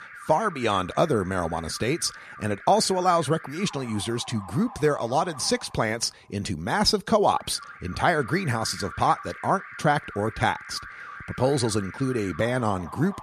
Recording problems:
alarms or sirens; noticeable; throughout; 15 dB below the speech

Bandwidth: 14 kHz